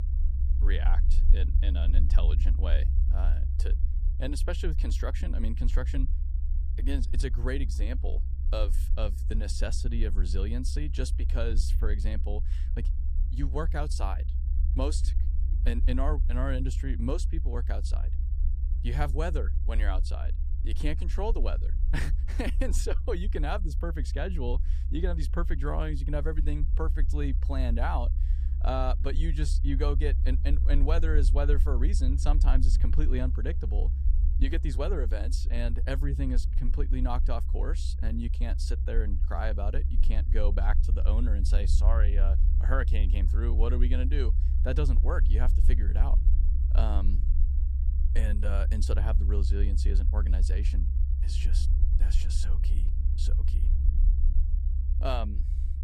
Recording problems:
low rumble; noticeable; throughout; 10 dB below the speech

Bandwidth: 15.5 kHz